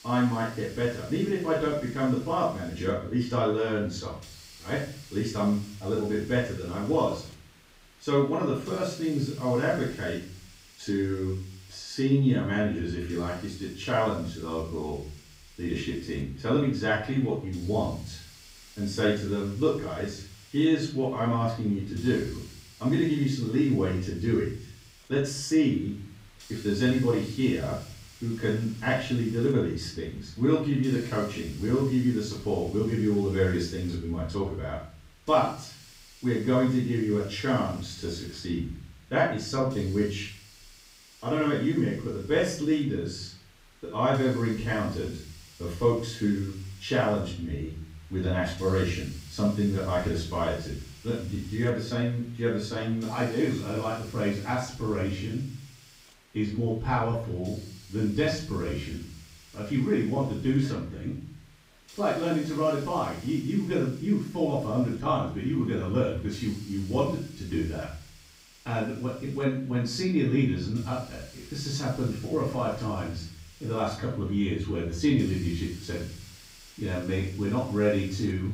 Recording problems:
off-mic speech; far
room echo; noticeable; dies away in 0.5 s
hiss; faint; throughout; 20 dB below the speech

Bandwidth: 15.5 kHz